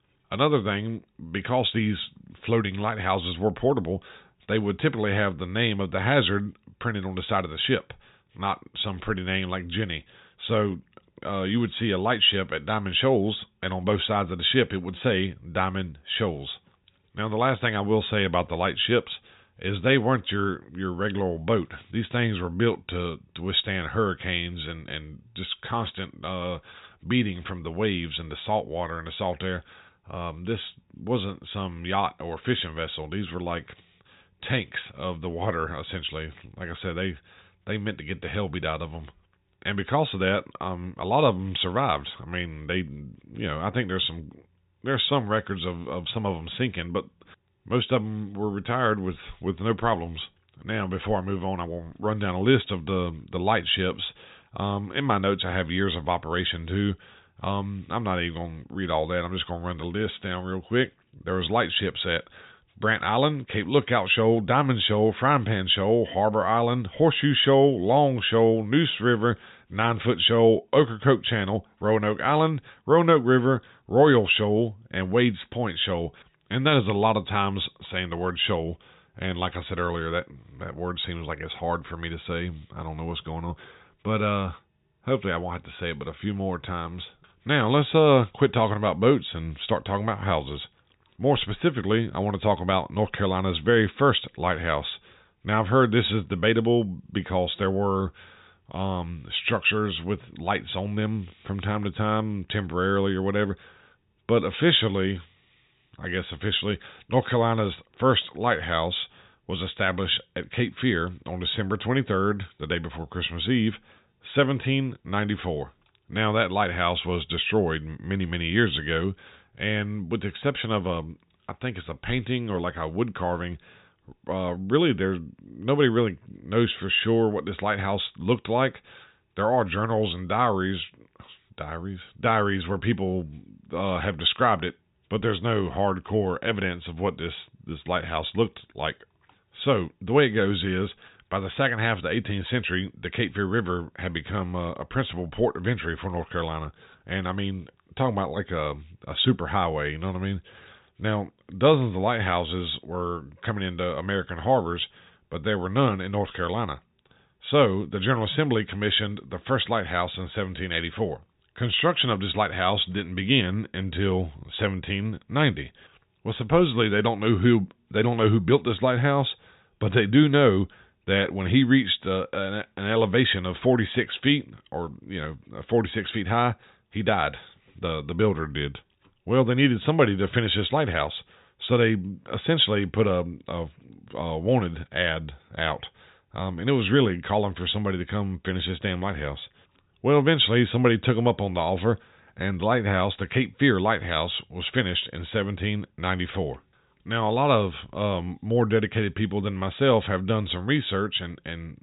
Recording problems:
high frequencies cut off; severe; nothing above 4 kHz

